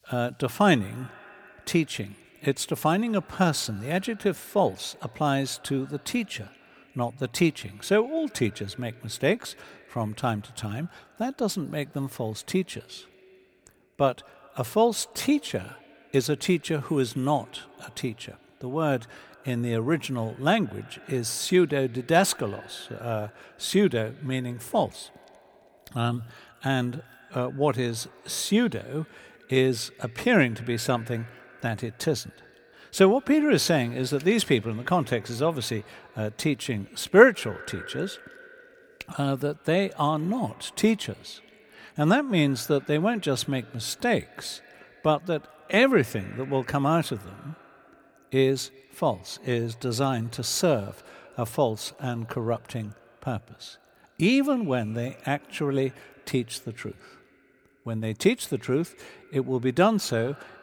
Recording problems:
echo of what is said; faint; throughout; 160 ms later, 25 dB below the speech

